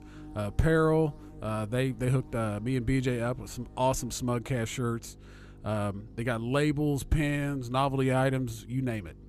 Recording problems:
electrical hum; faint; throughout; 50 Hz, 25 dB below the speech

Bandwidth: 14.5 kHz